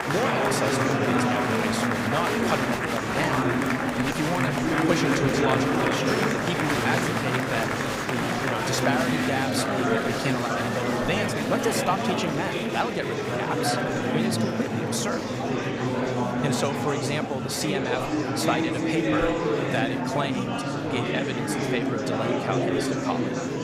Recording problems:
murmuring crowd; very loud; throughout; 5 dB above the speech

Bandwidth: 15.5 kHz